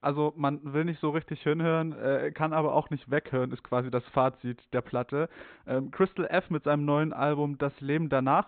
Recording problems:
high frequencies cut off; severe; nothing above 4 kHz

